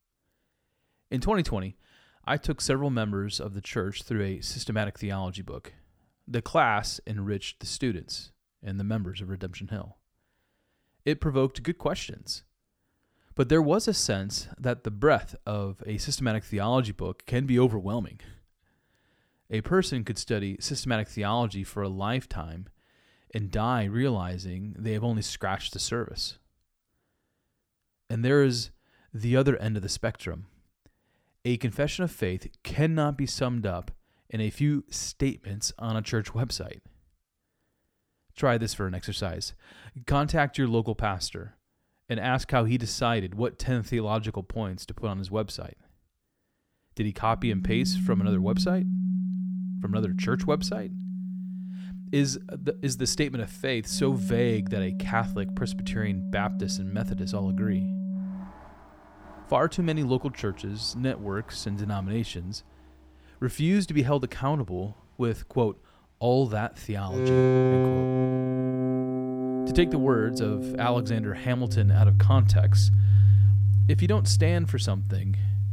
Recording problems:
background music; very loud; from 48 s on; 3 dB above the speech

